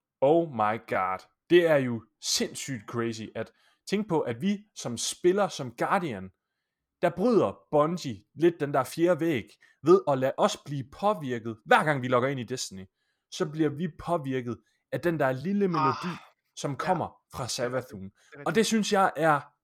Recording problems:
uneven, jittery; strongly; from 1 to 18 s

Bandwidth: 18.5 kHz